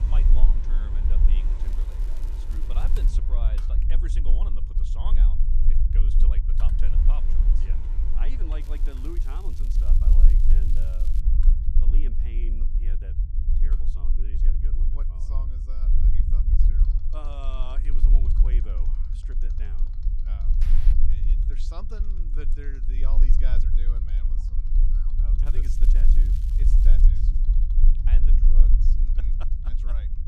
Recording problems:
machinery noise; loud; throughout; 9 dB below the speech
low rumble; loud; throughout; 1 dB below the speech
crackling; loud; from 1.5 to 3 s, from 8.5 to 11 s and from 25 to 27 s; 9 dB below the speech

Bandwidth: 14.5 kHz